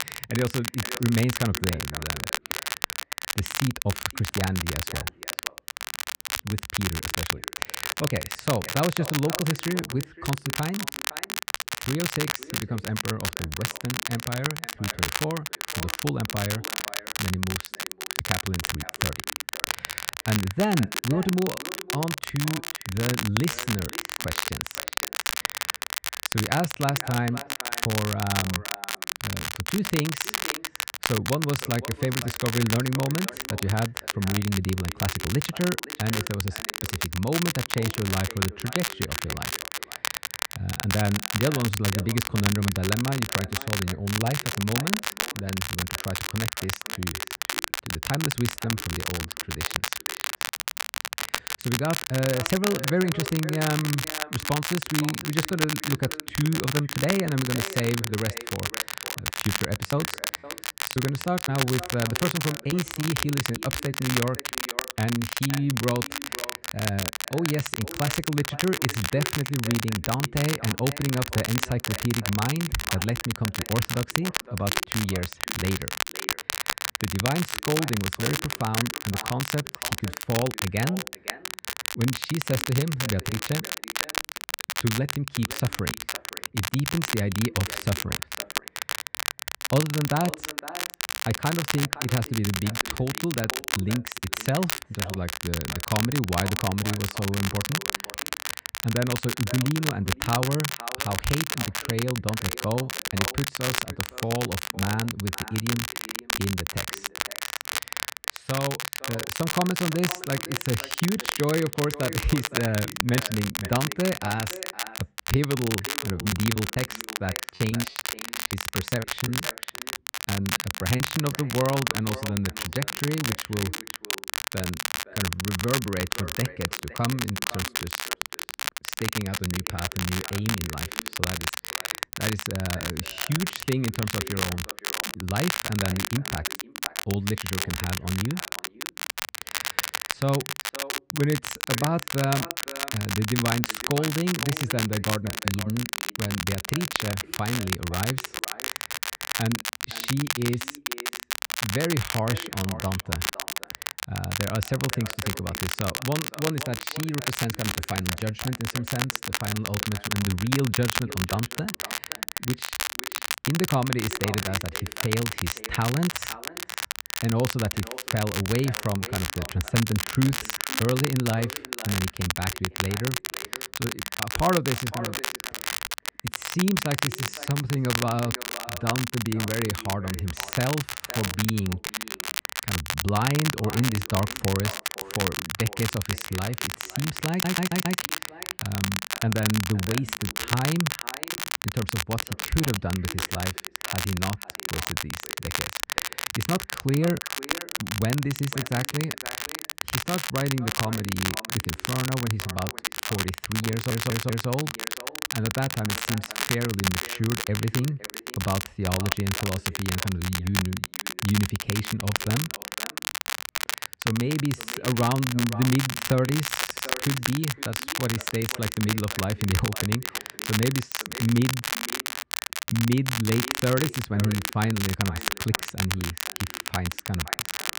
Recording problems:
echo of what is said; noticeable; throughout; 510 ms later, 20 dB below the speech
muffled; slightly; fading above 3 kHz
crackle, like an old record; loud; 1 dB below the speech
choppy; very; from 59 s to 1:04 and from 1:56 to 2:01; 16% of the speech affected
audio stuttering; at 3:07, at 3:24 and at 3:37

